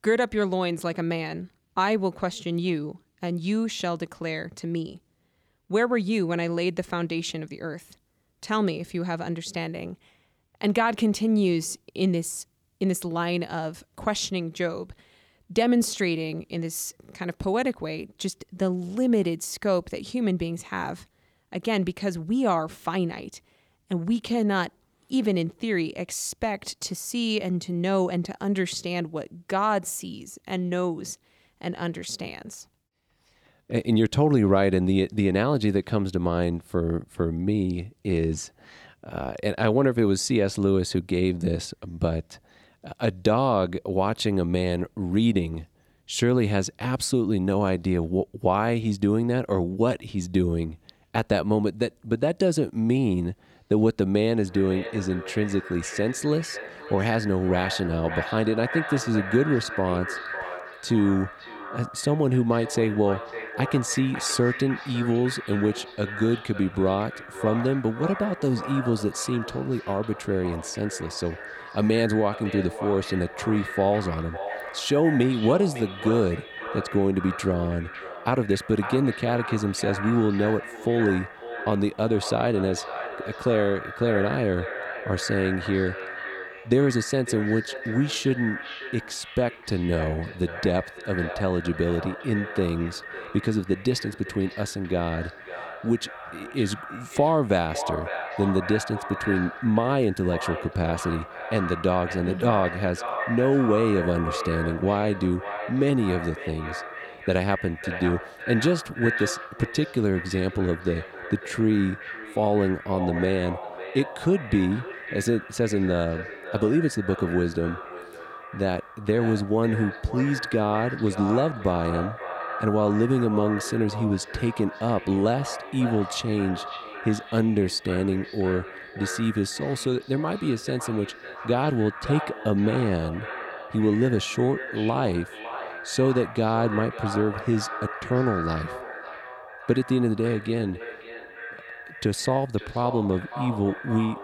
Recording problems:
echo of what is said; strong; from 54 s on; 550 ms later, 10 dB below the speech

